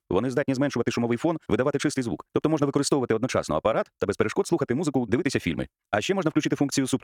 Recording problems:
wrong speed, natural pitch; too fast; 1.6 times normal speed

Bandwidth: 17.5 kHz